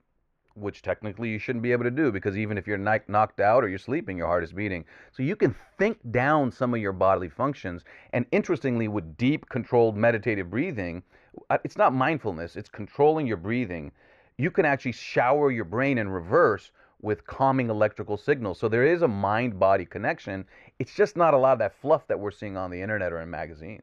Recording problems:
muffled; very; fading above 4 kHz

